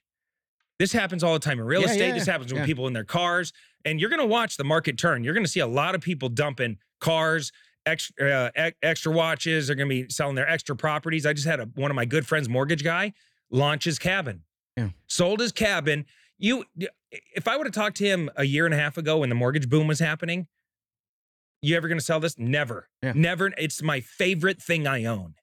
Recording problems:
none

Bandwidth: 18.5 kHz